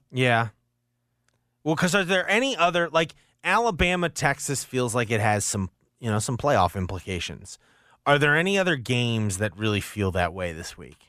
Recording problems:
none

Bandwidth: 15 kHz